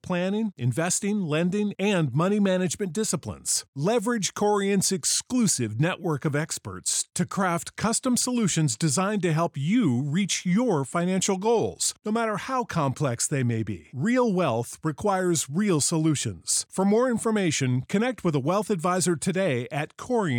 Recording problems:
abrupt cut into speech; at the end

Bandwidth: 18 kHz